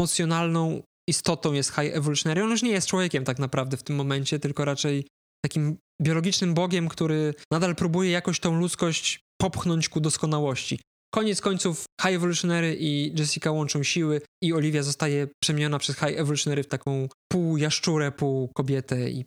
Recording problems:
squashed, flat; somewhat
abrupt cut into speech; at the start

